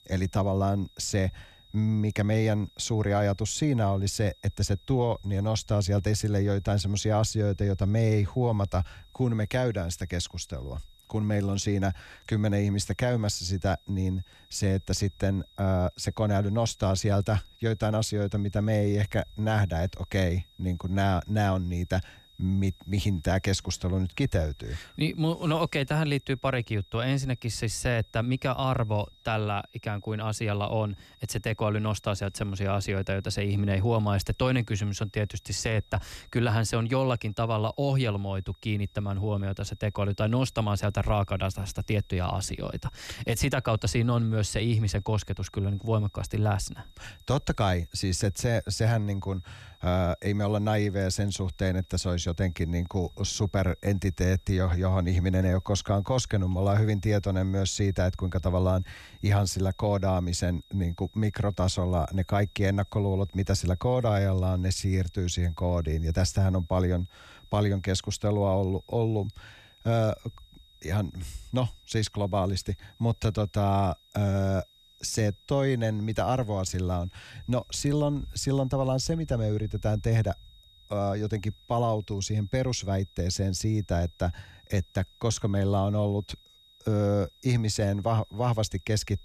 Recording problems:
high-pitched whine; faint; throughout; 3.5 kHz, 30 dB below the speech

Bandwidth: 14 kHz